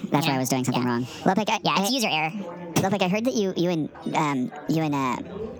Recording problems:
wrong speed and pitch; too fast and too high; 1.5 times normal speed
squashed, flat; somewhat, background pumping
chatter from many people; noticeable; throughout; 20 dB below the speech

